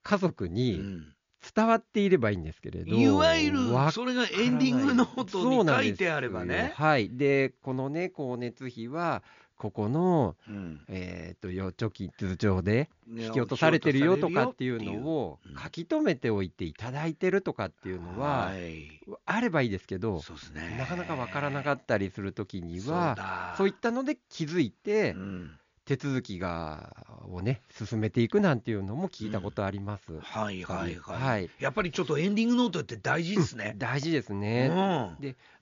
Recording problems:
high frequencies cut off; noticeable; nothing above 7 kHz

